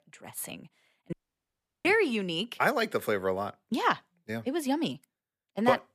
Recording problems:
audio cutting out; at 1 s for 0.5 s

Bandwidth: 14.5 kHz